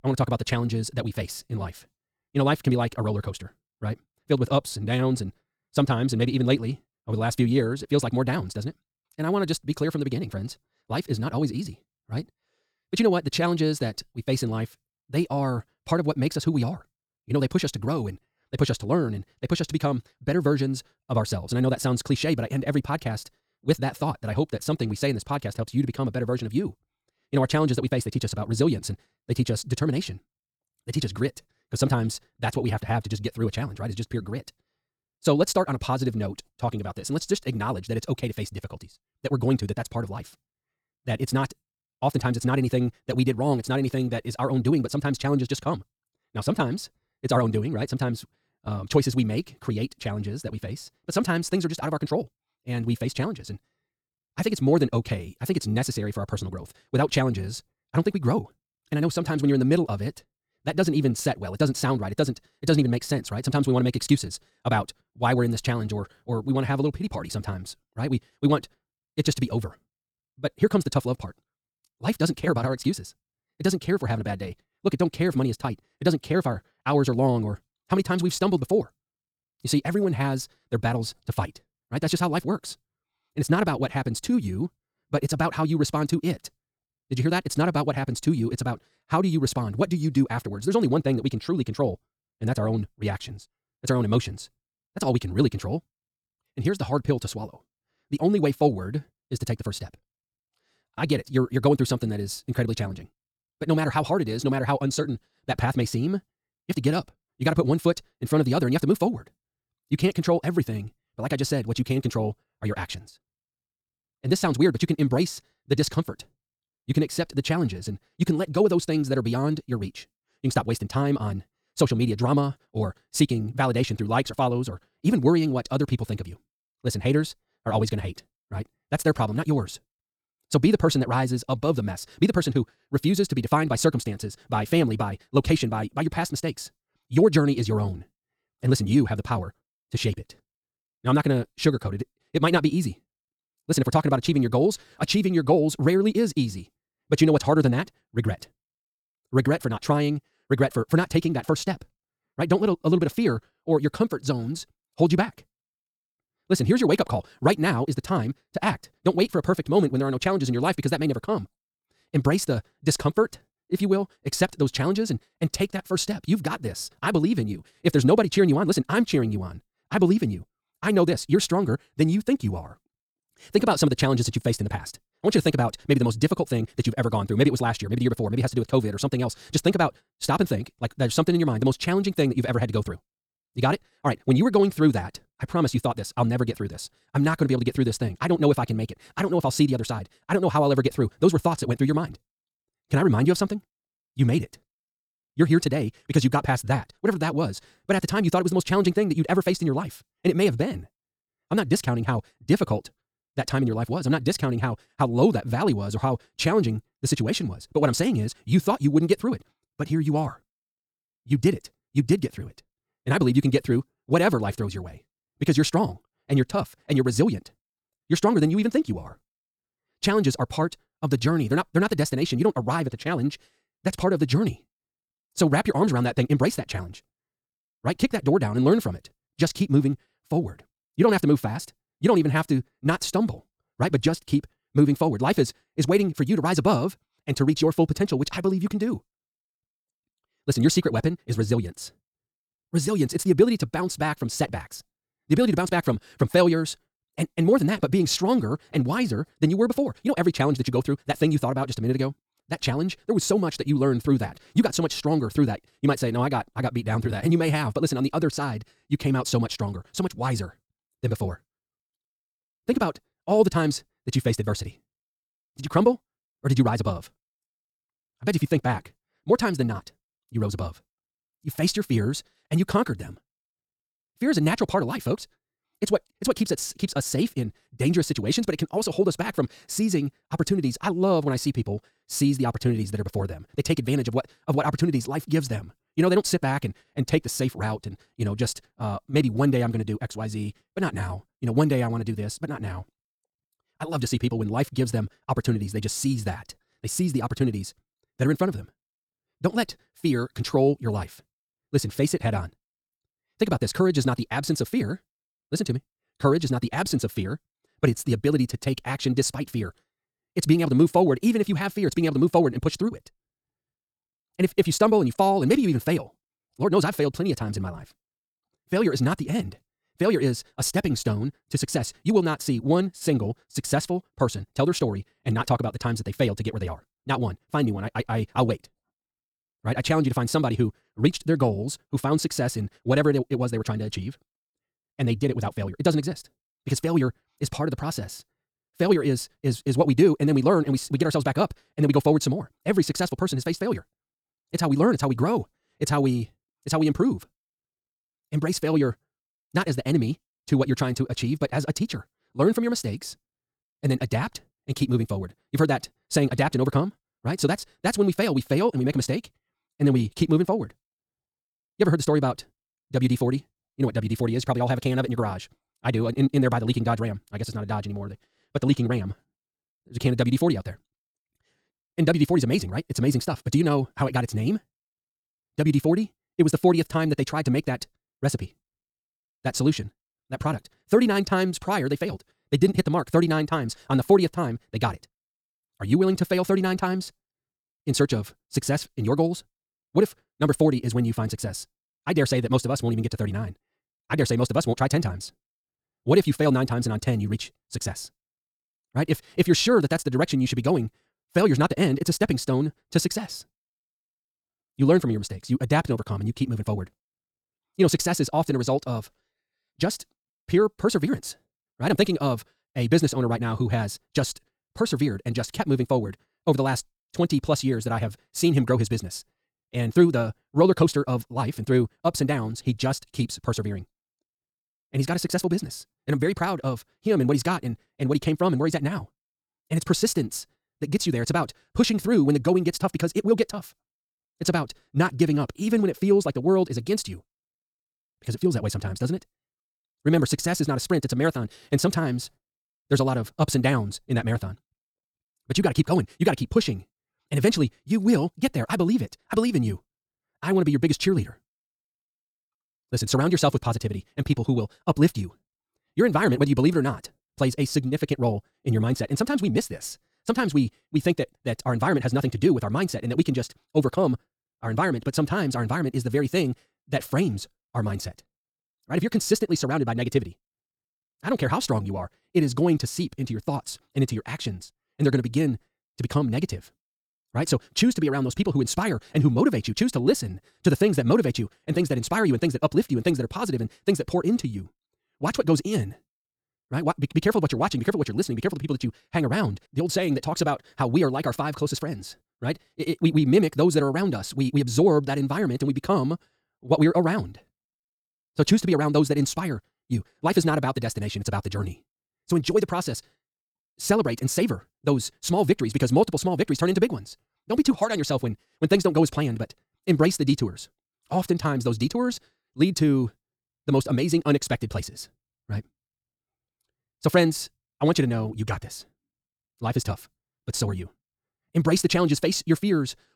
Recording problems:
wrong speed, natural pitch; too fast; 1.8 times normal speed

